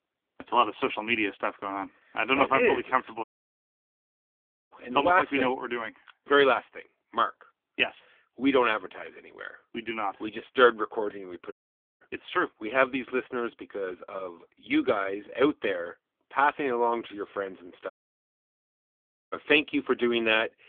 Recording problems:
phone-call audio; poor line; nothing above 3.5 kHz
audio cutting out; at 3 s for 1.5 s, at 12 s and at 18 s for 1.5 s

